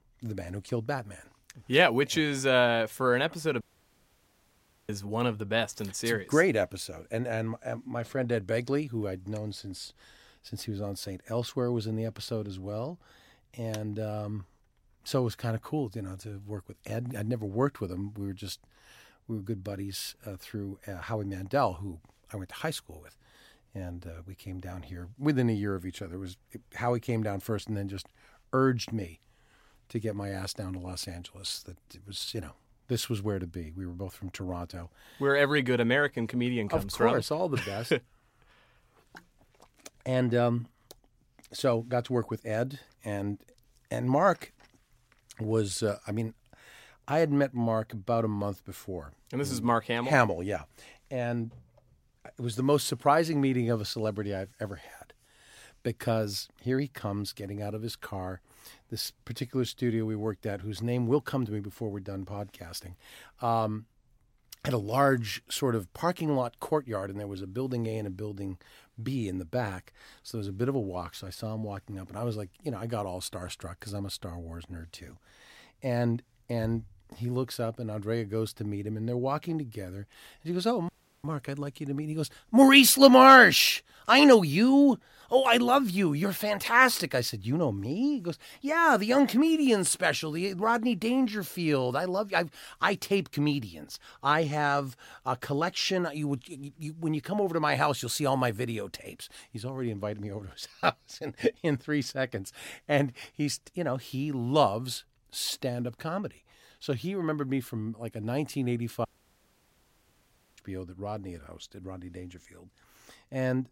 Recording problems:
audio cutting out; at 3.5 s for 1.5 s, at 1:21 and at 1:49 for 1.5 s

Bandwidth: 16 kHz